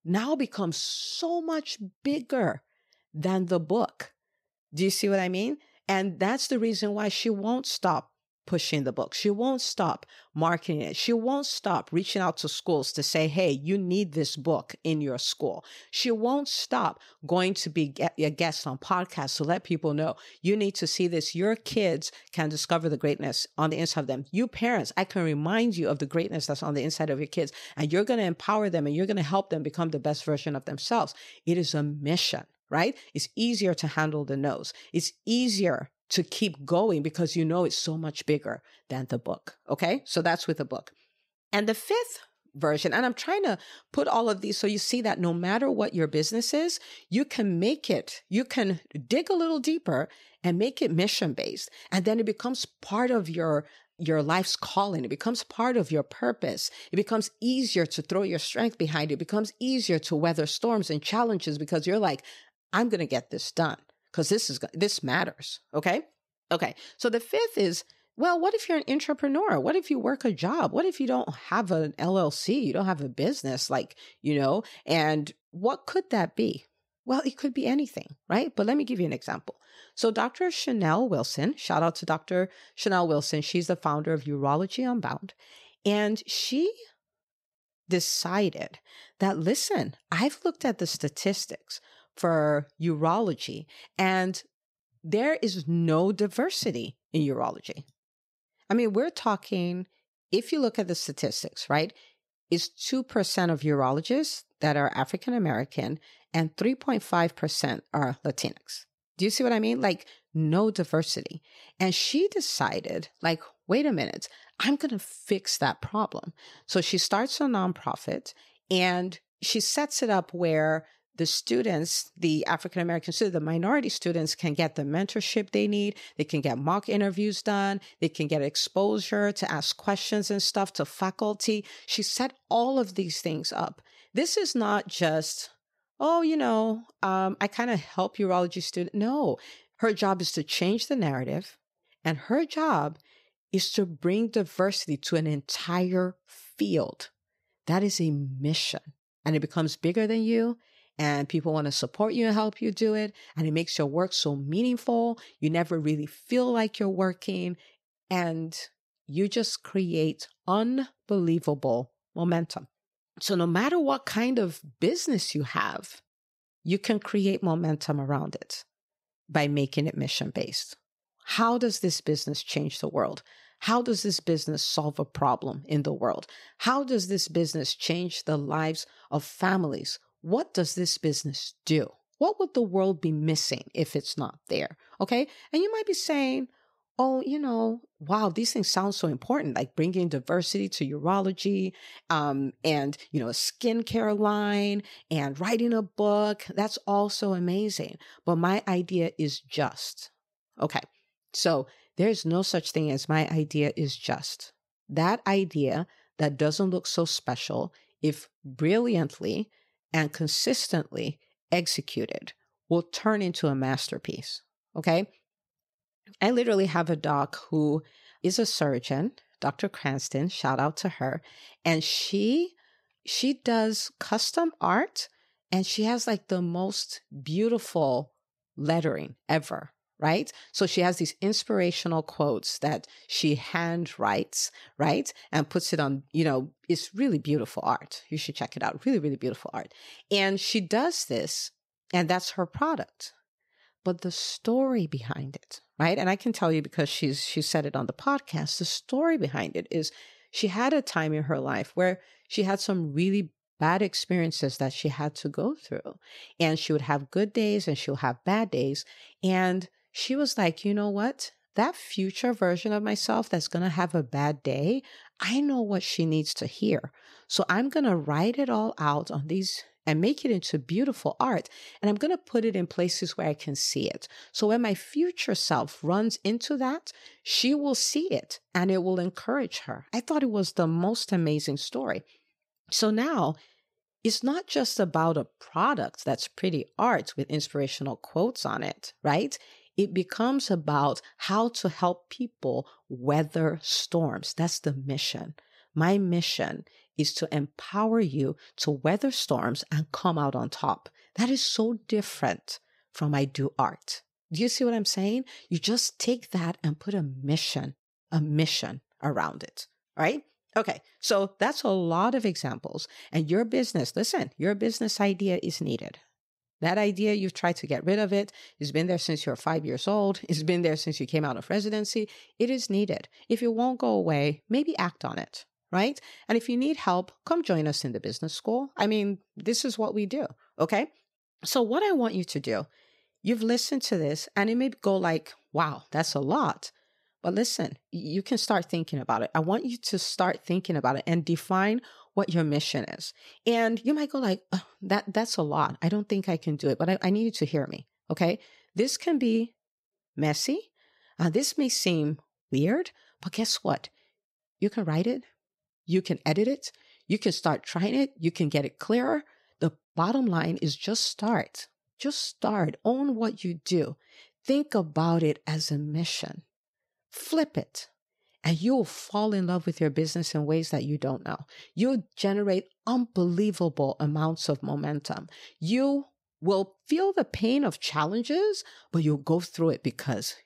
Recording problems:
none

